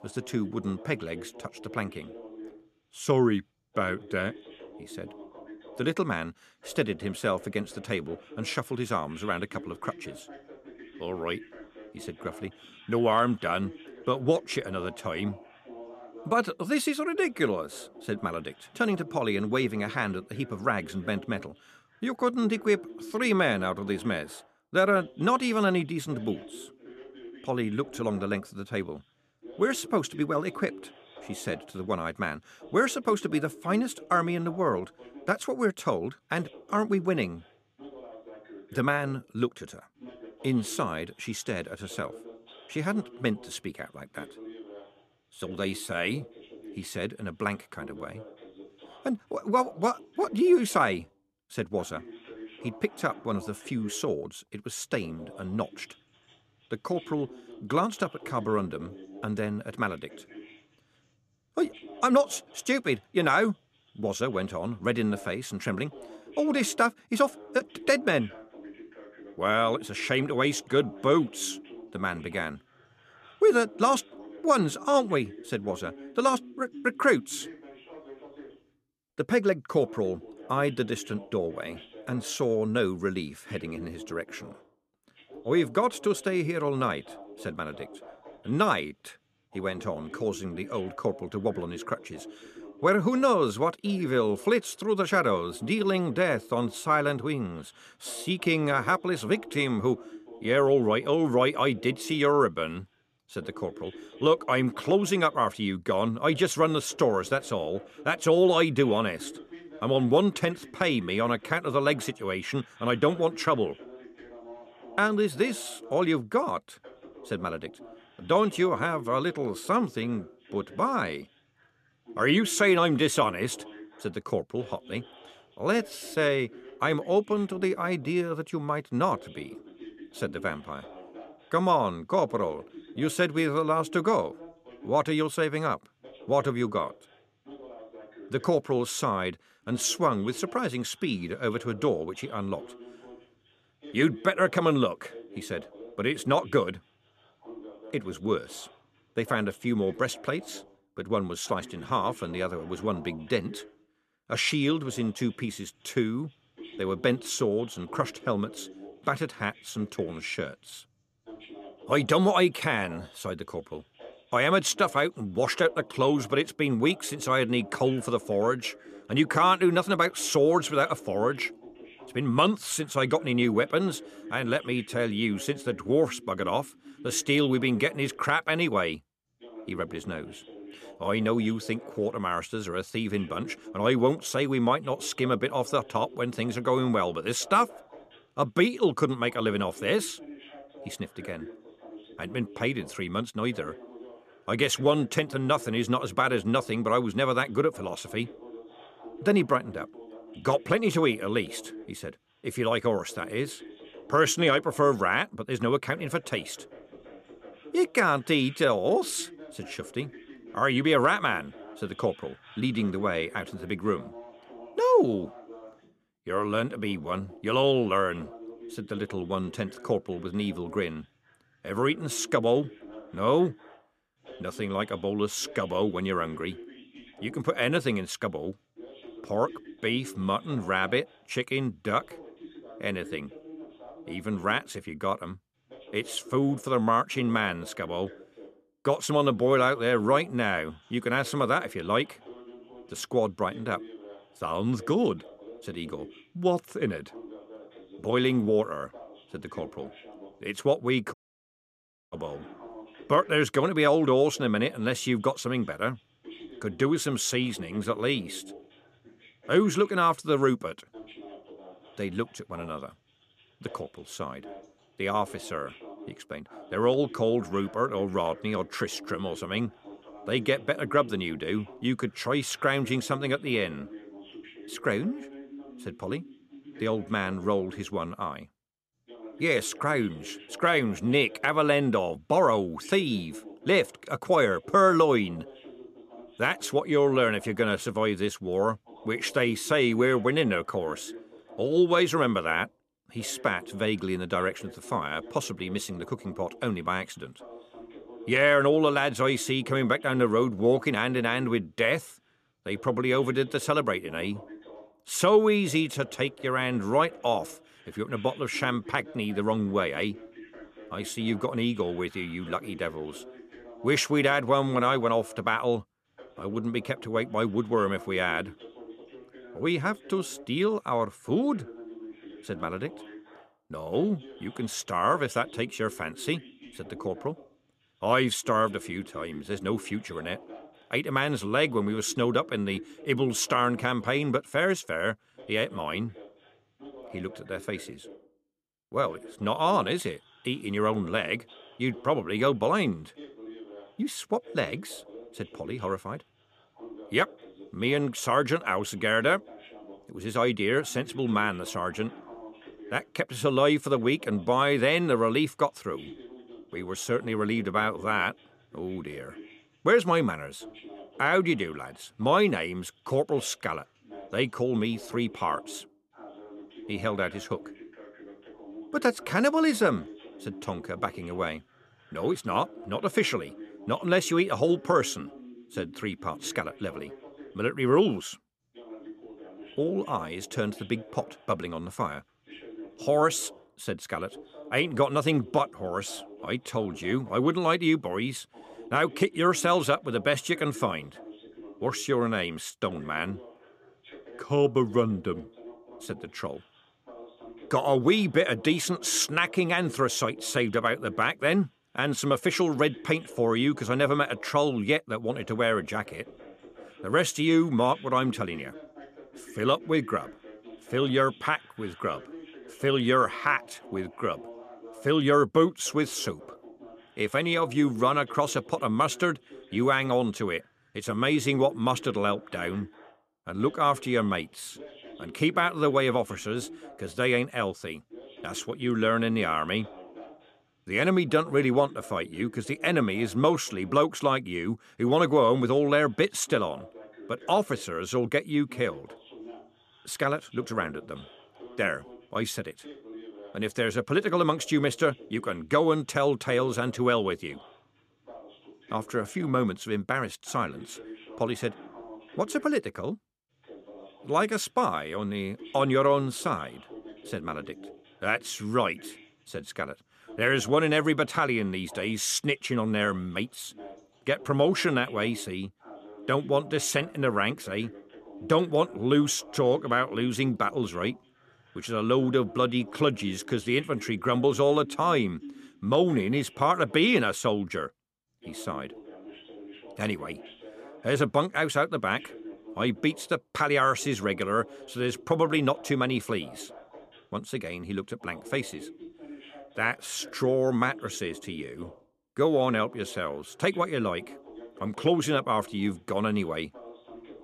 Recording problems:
voice in the background; noticeable; throughout; 20 dB below the speech
audio cutting out; at 4:11 for 1 s

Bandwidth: 14 kHz